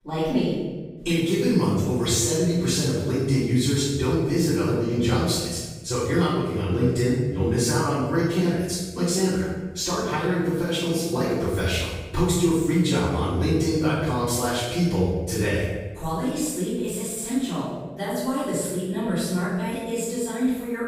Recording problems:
room echo; strong; dies away in 1.1 s
off-mic speech; far

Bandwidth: 15.5 kHz